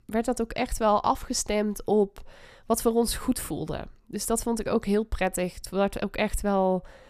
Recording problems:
none

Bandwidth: 14.5 kHz